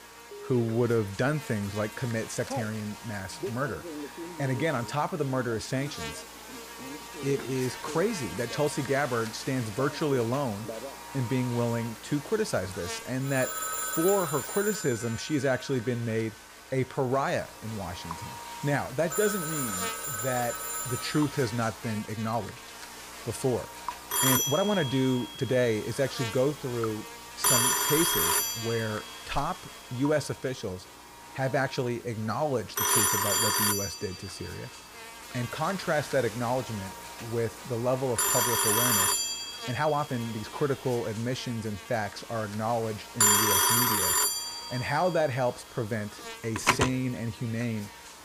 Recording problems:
alarms or sirens; very loud; throughout; 4 dB above the speech
electrical hum; loud; throughout; 60 Hz, 10 dB below the speech
rain or running water; faint; throughout; 25 dB below the speech
uneven, jittery; strongly; from 2.5 to 44 s

